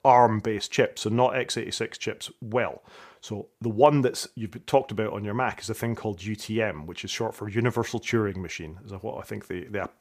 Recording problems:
none

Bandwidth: 15 kHz